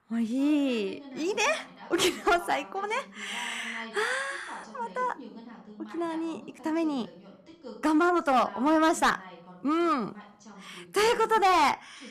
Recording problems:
distortion; slight; 3% of the sound clipped
voice in the background; noticeable; throughout; 20 dB below the speech

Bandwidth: 14.5 kHz